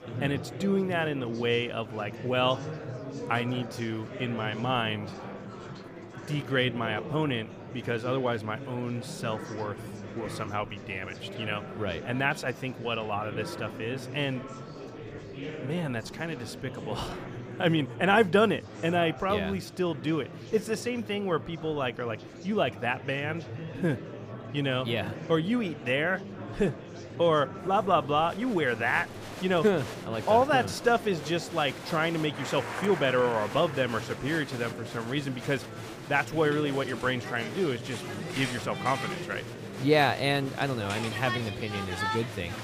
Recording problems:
murmuring crowd; loud; throughout; 10 dB below the speech

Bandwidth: 15 kHz